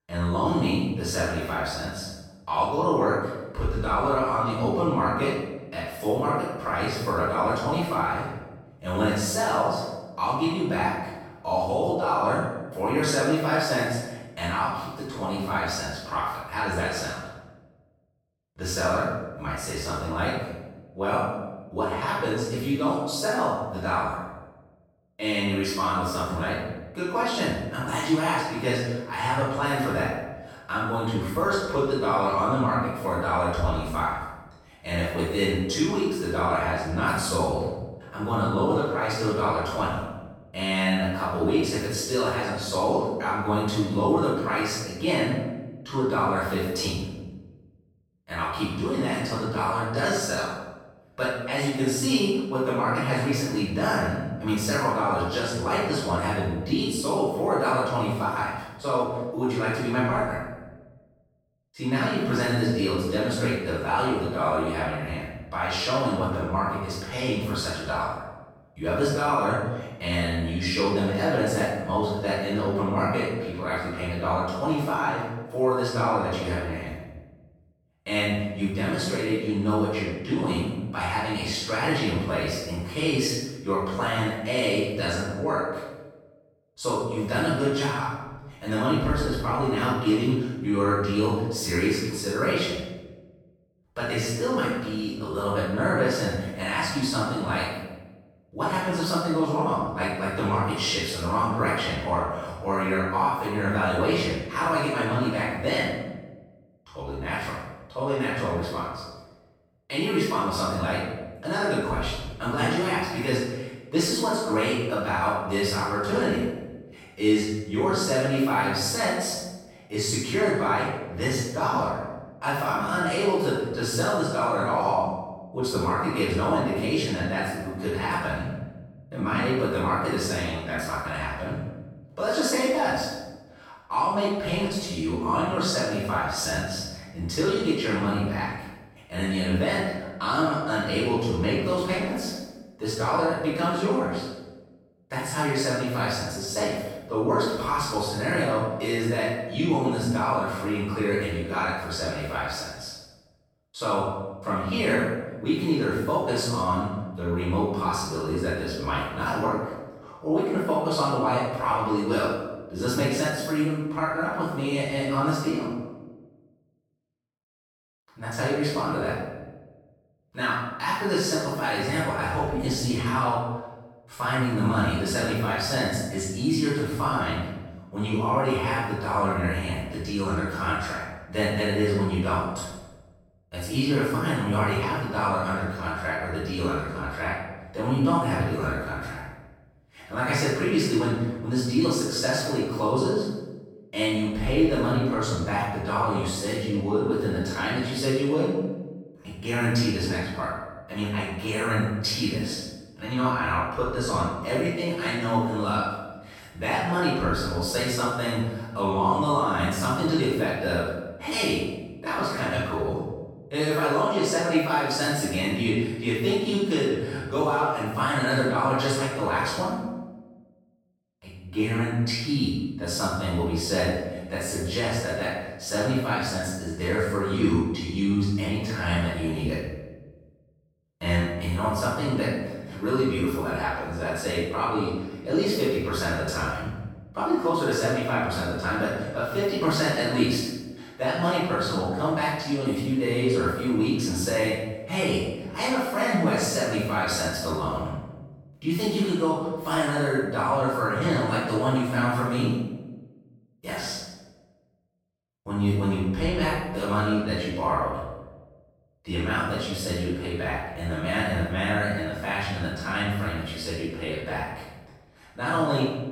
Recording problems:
room echo; strong; dies away in 1 s
off-mic speech; far

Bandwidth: 17 kHz